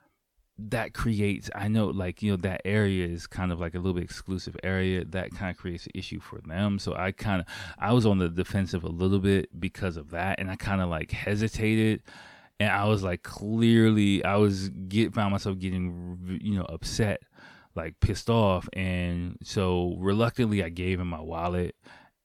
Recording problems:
none

